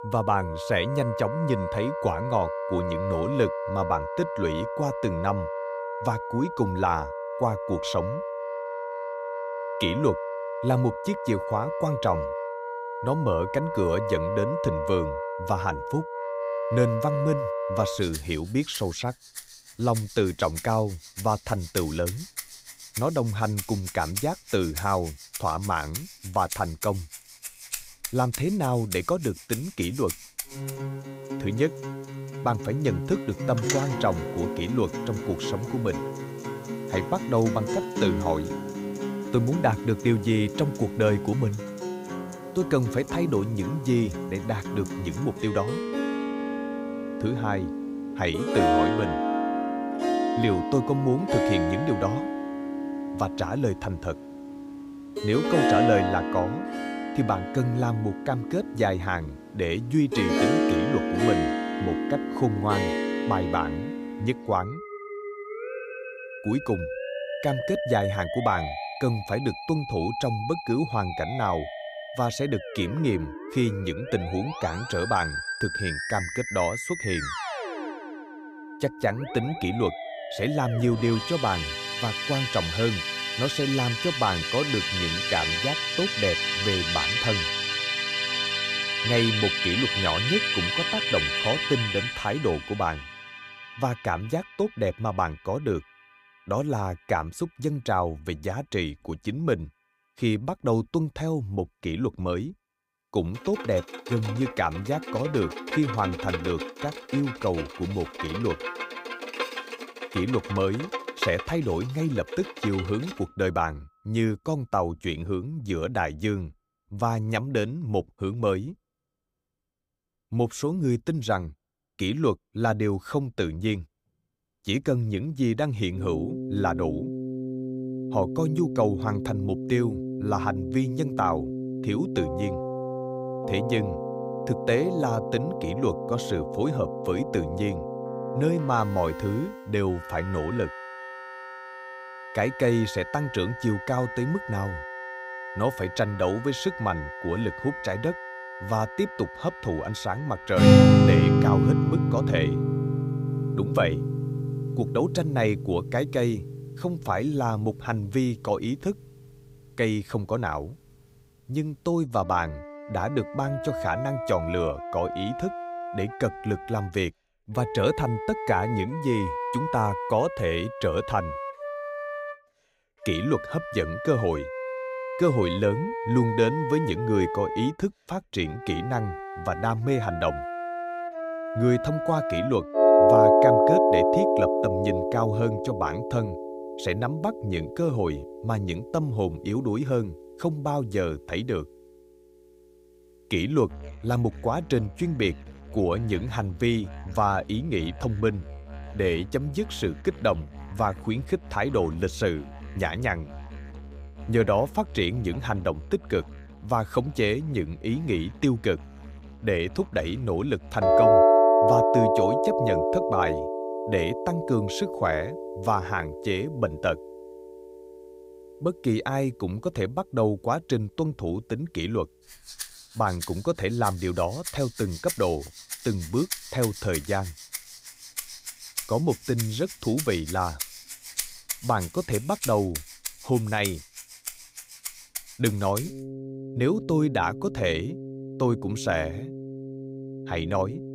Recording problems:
background music; loud; throughout; 1 dB below the speech

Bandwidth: 15.5 kHz